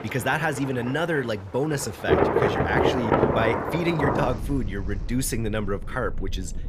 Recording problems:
rain or running water; very loud; throughout; 2 dB above the speech

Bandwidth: 14.5 kHz